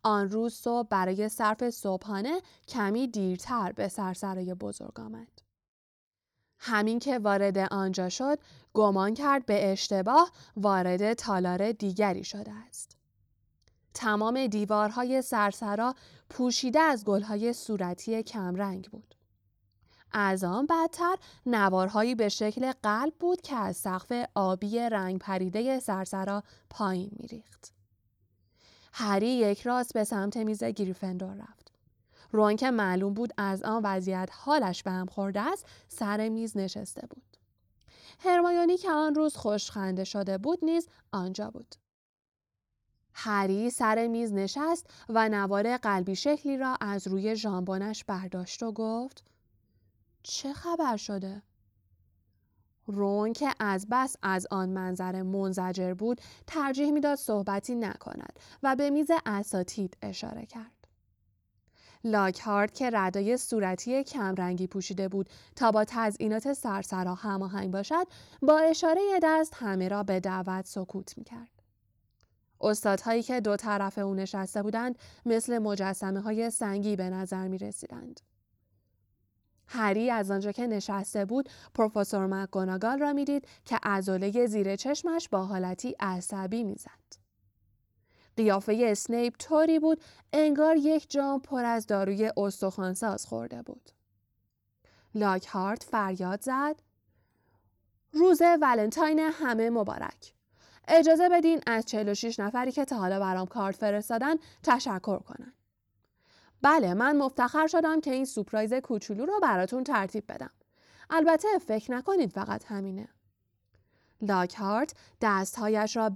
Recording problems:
abrupt cut into speech; at the end

